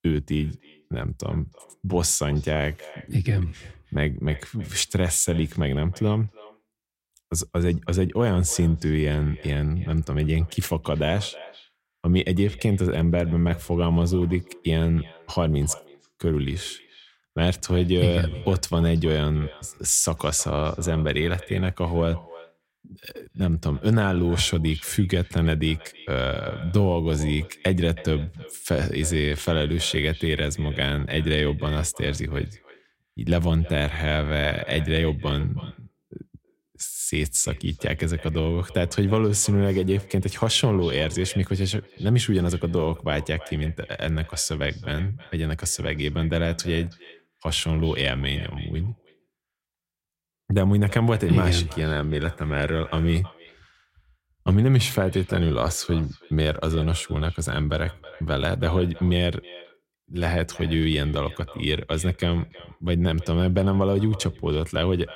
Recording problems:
echo of what is said; faint; throughout; 320 ms later, 20 dB below the speech

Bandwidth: 16 kHz